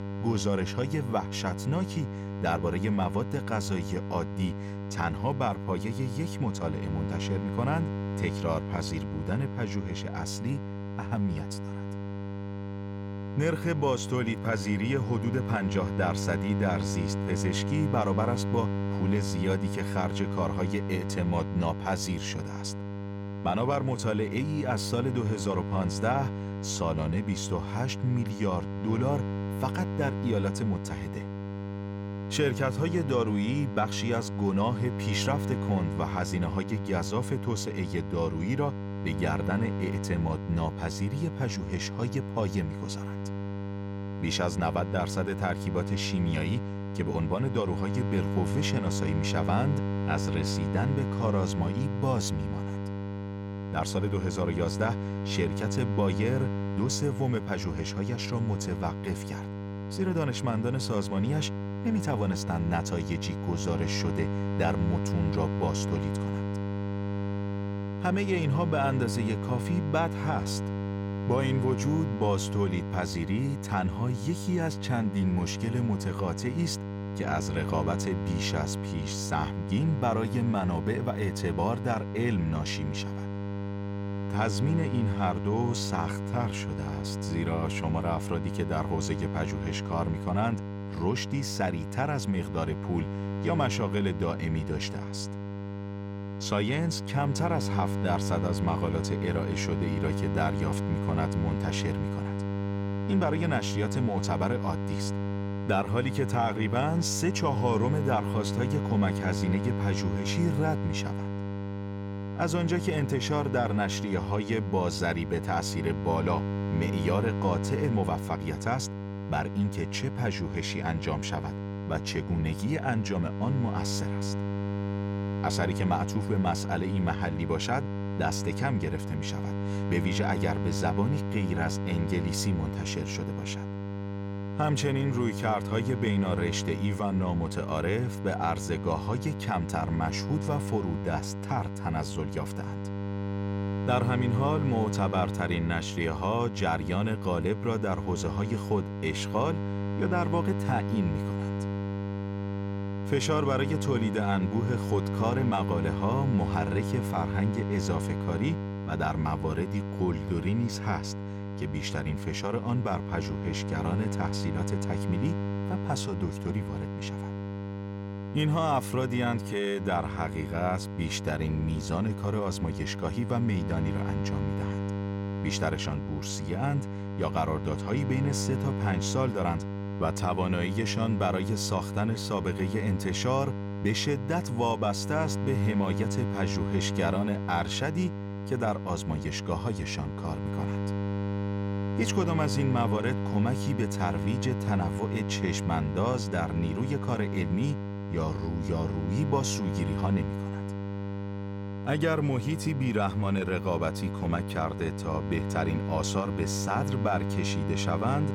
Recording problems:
electrical hum; loud; throughout; 50 Hz, 7 dB below the speech

